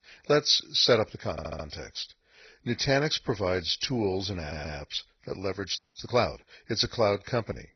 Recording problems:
garbled, watery; badly; nothing above 6 kHz
audio stuttering; at 1.5 s and at 4.5 s
audio freezing; at 6 s

